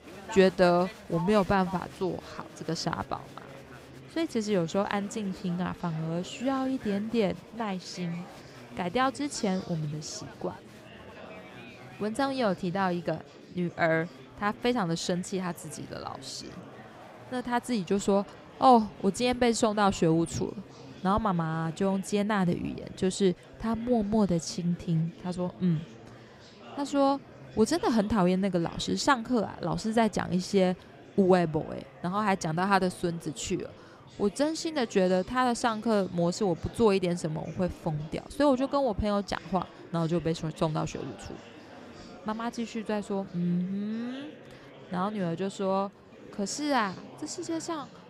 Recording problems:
murmuring crowd; noticeable; throughout; 20 dB below the speech

